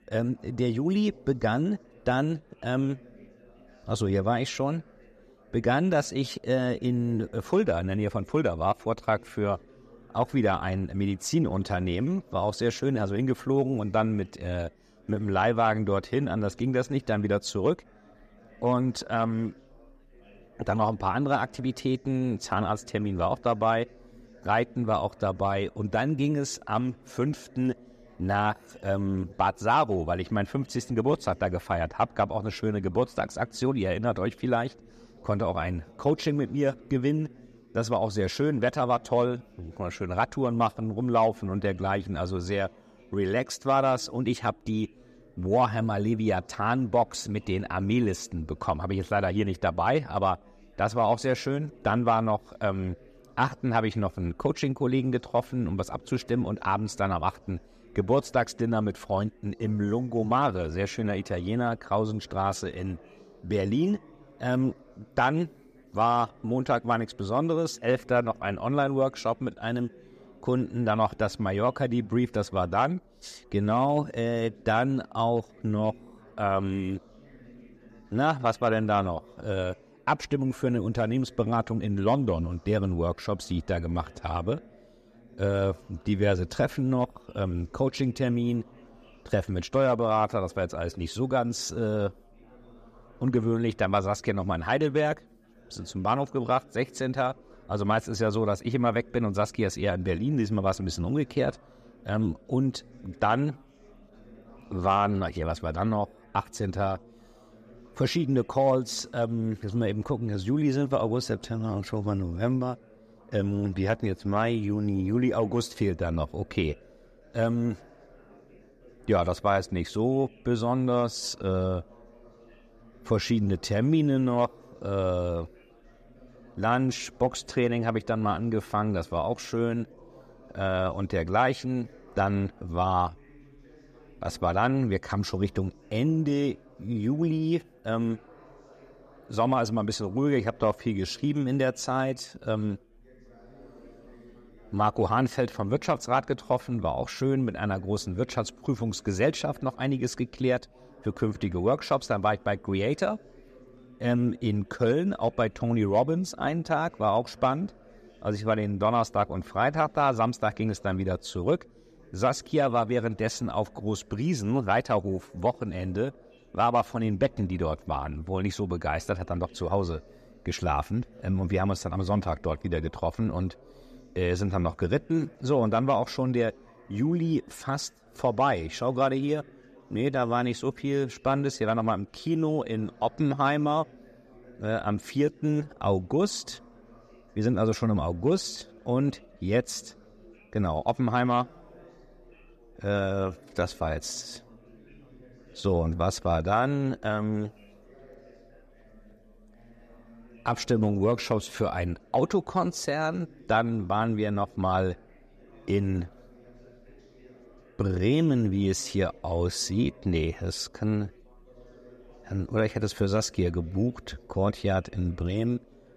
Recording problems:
chatter from many people; faint; throughout; 25 dB below the speech

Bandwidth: 14.5 kHz